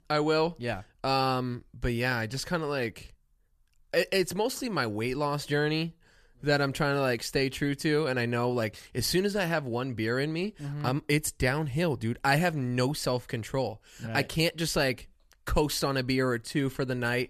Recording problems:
none

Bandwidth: 14.5 kHz